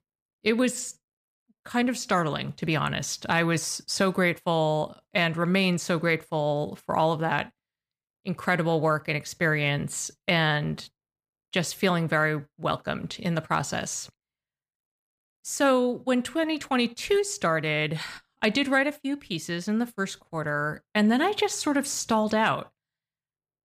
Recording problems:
none

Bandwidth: 15 kHz